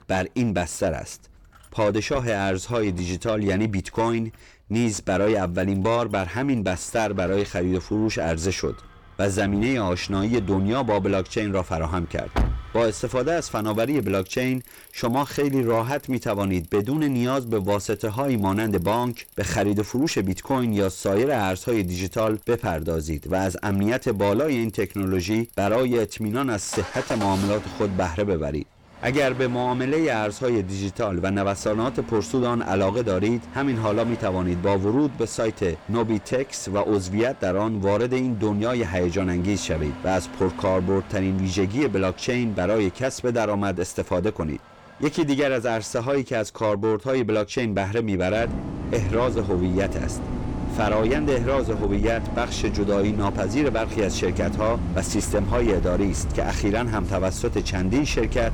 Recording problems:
distortion; slight; 10 dB below the speech
traffic noise; loud; throughout; 10 dB below the speech

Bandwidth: 18 kHz